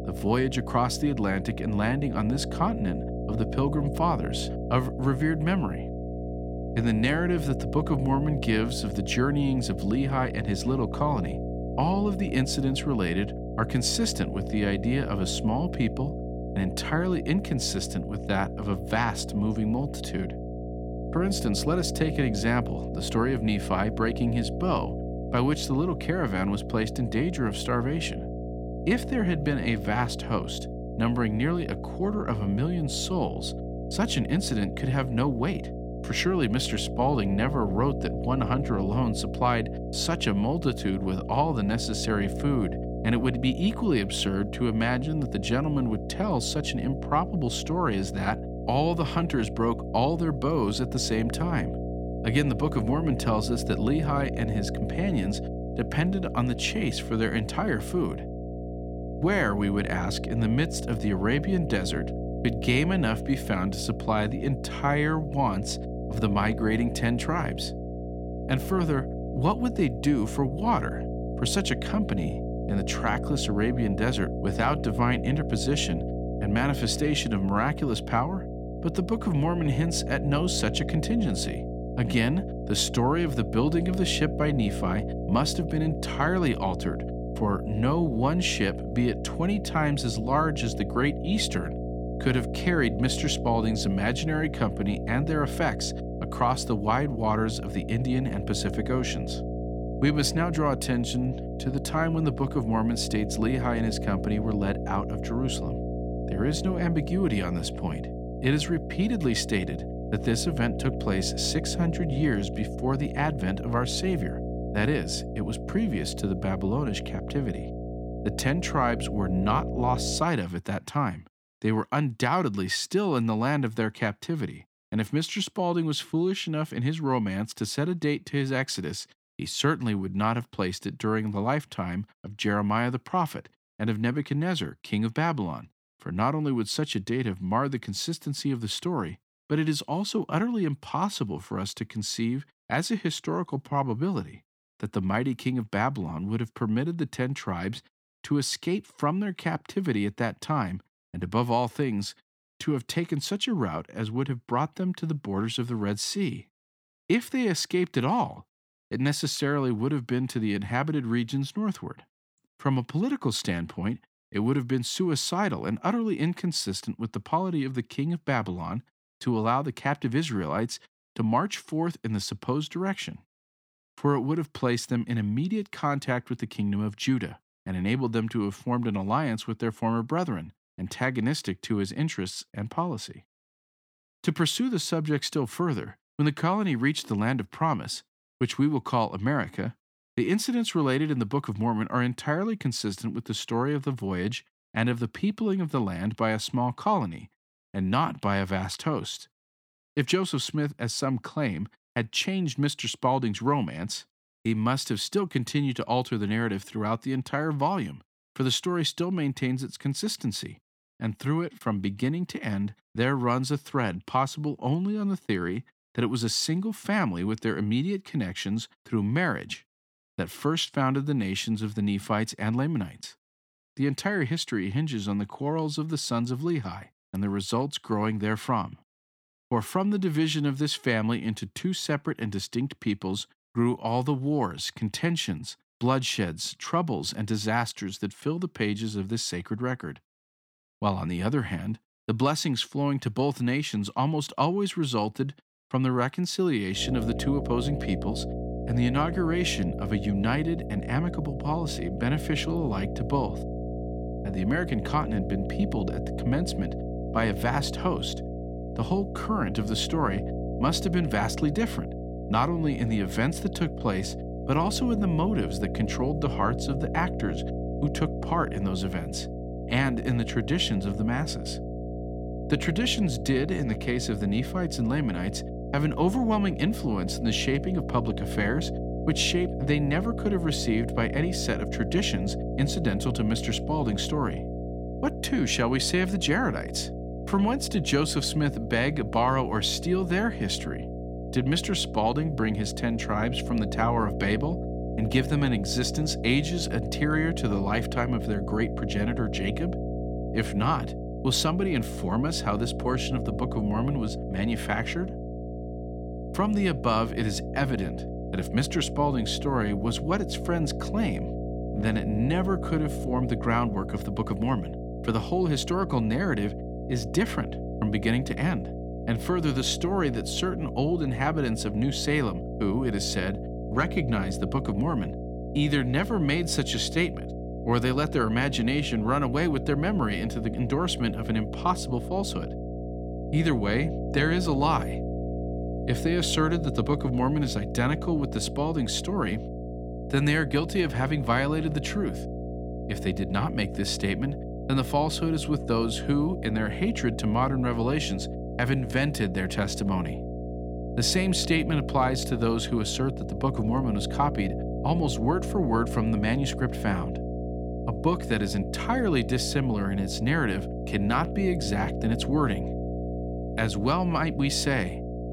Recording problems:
electrical hum; loud; until 2:00 and from 4:07 on; 60 Hz, 8 dB below the speech

